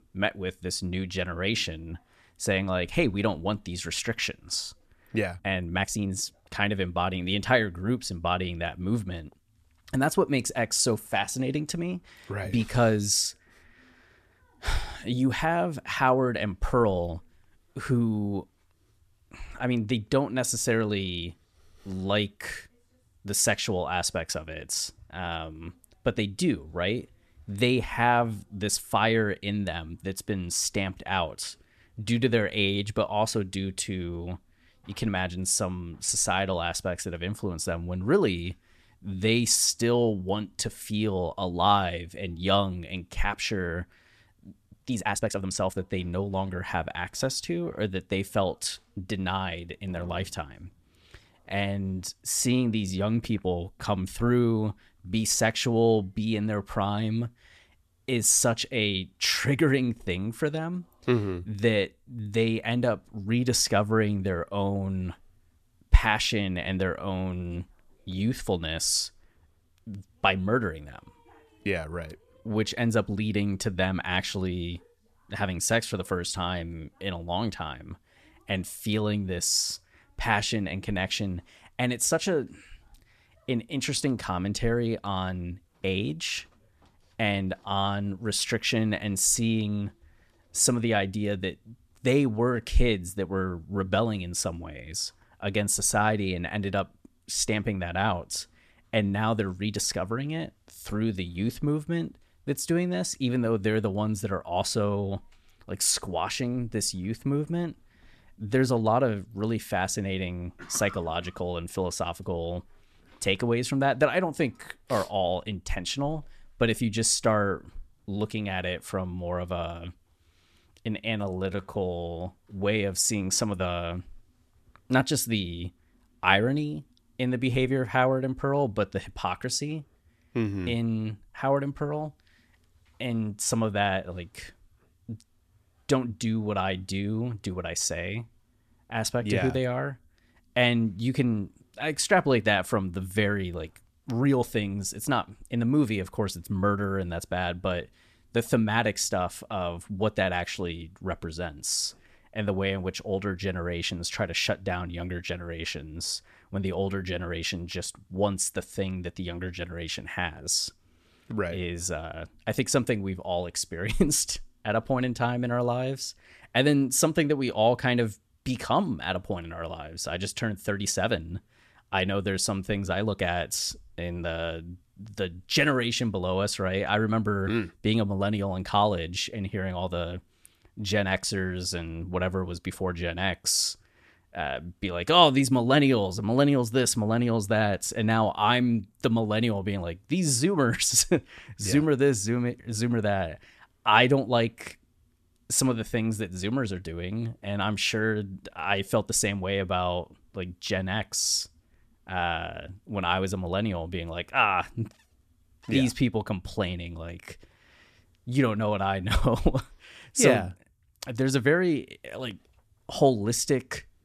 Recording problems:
uneven, jittery; strongly; from 5.5 s to 2:02

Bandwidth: 14 kHz